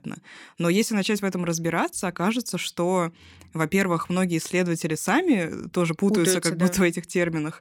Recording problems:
none

